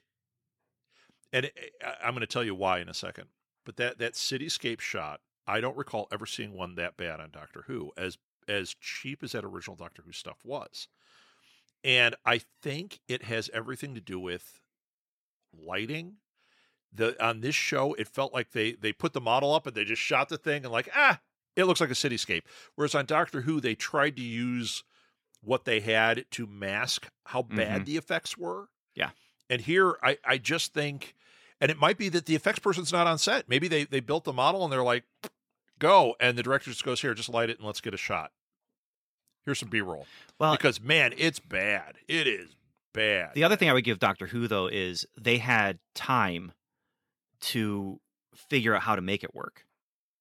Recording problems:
none

